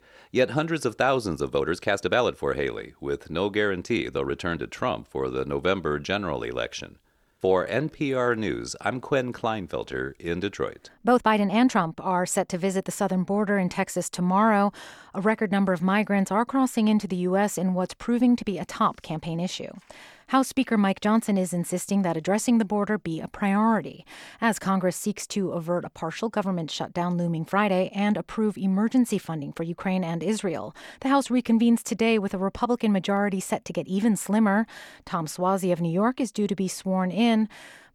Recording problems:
uneven, jittery; strongly; from 1.5 to 31 s

